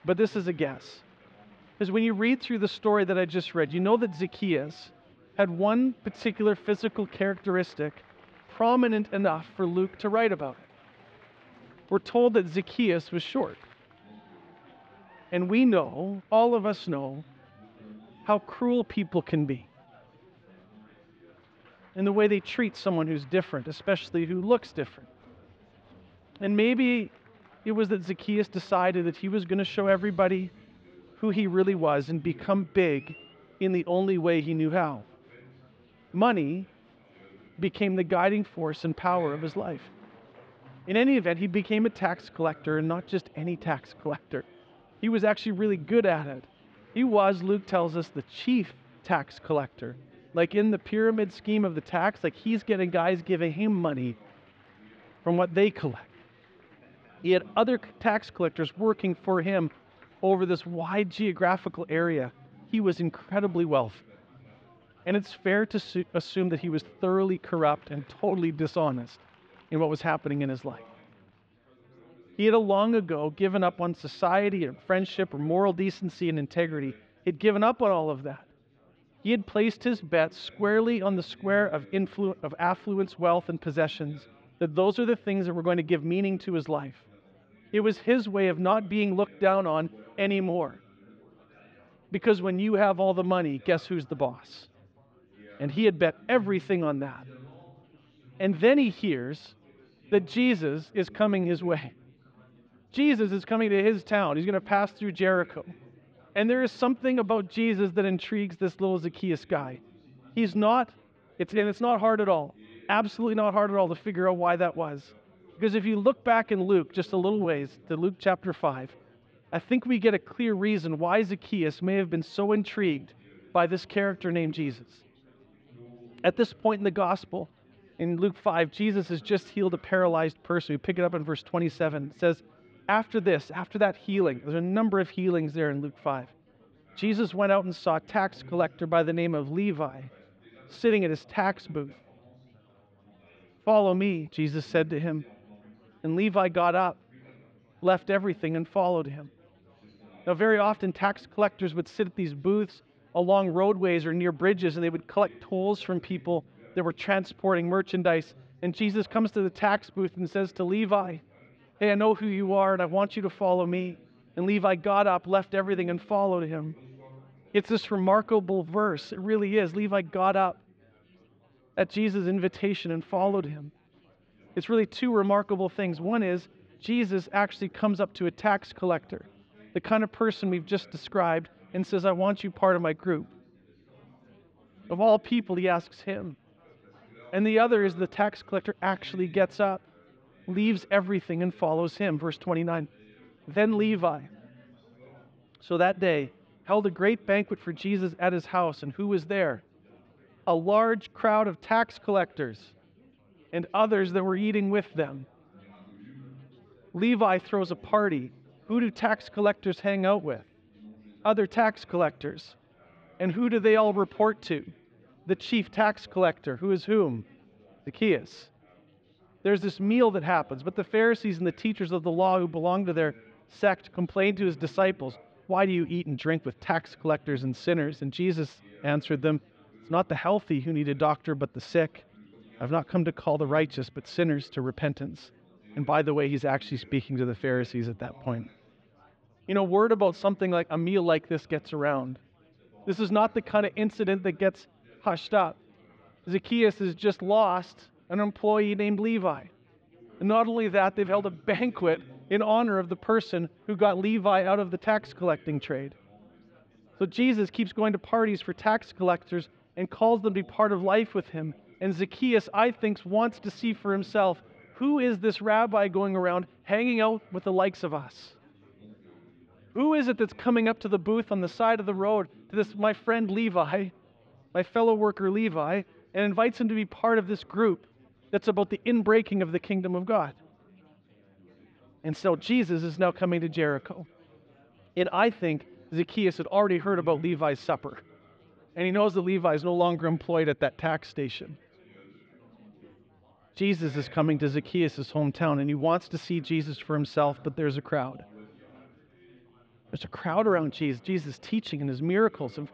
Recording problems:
muffled; slightly; fading above 3.5 kHz
chatter from many people; faint; throughout; 30 dB below the speech

